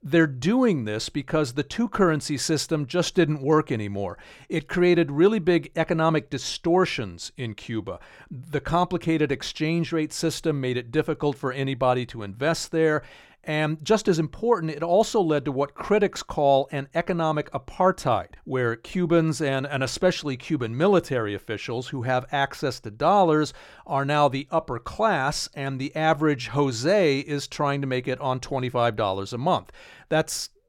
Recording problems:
none

